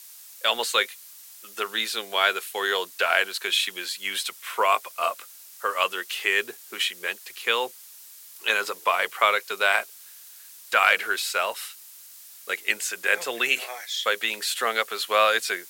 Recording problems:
thin; very; fading below 450 Hz
hiss; noticeable; throughout; 20 dB below the speech

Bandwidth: 16.5 kHz